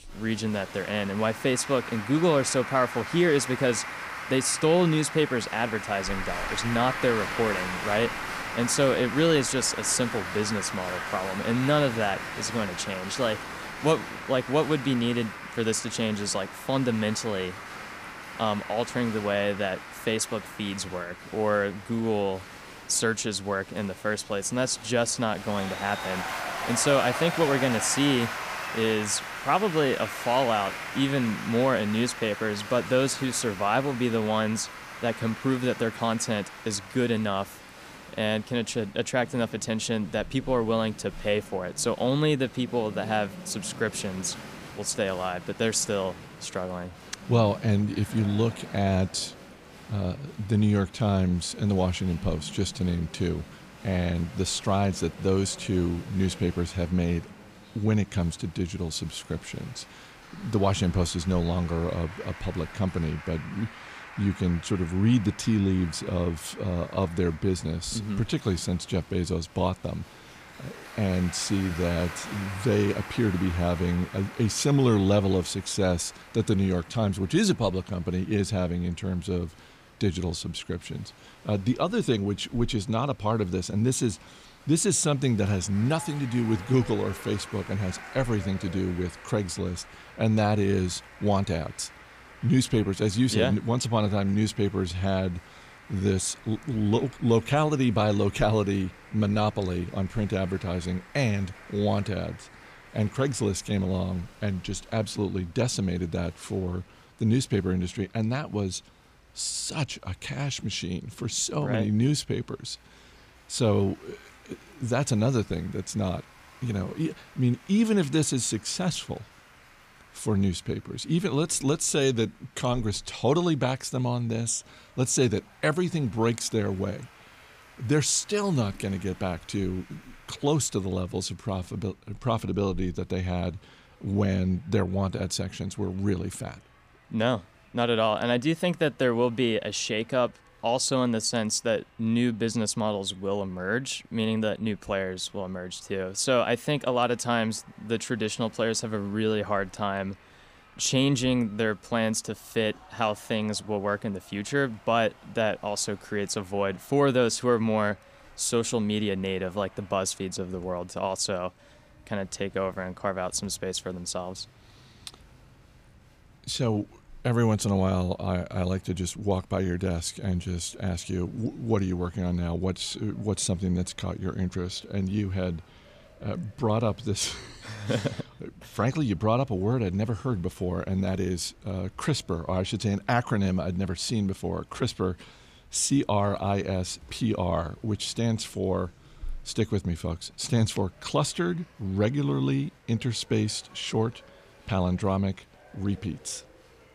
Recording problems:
crowd noise; noticeable; throughout; 10 dB below the speech

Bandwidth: 15 kHz